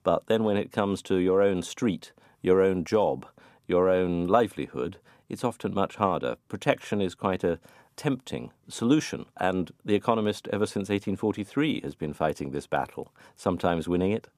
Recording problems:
none

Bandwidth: 15 kHz